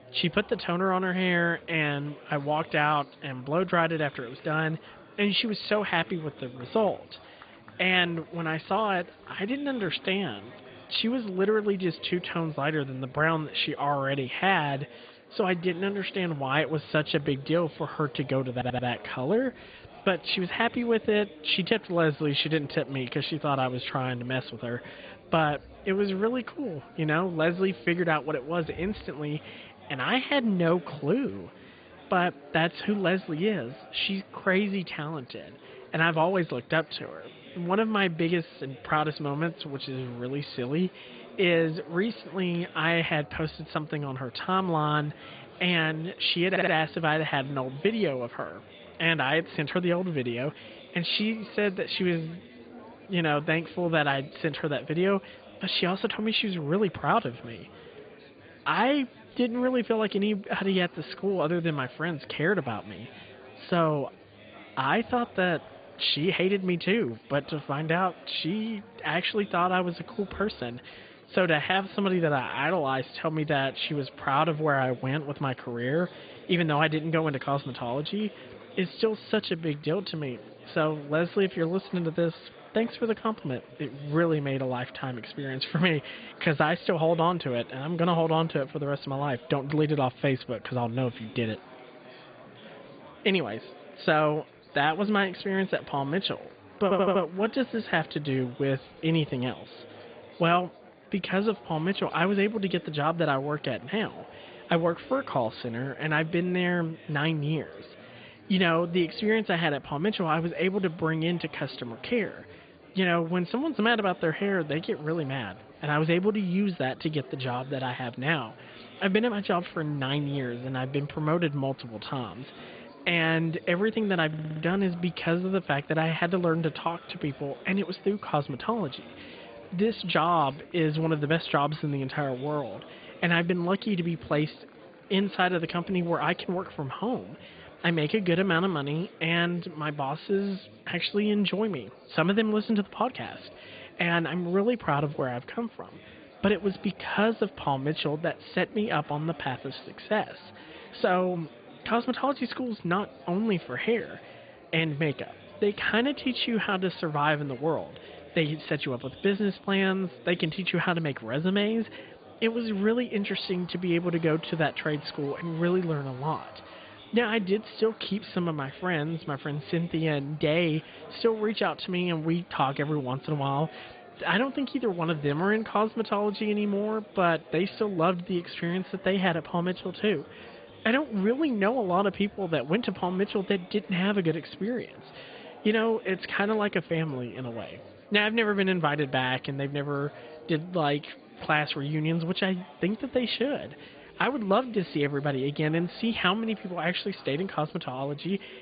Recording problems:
high frequencies cut off; severe; nothing above 4.5 kHz
garbled, watery; slightly
murmuring crowd; faint; throughout; 20 dB below the speech
audio stuttering; 4 times, first at 19 s

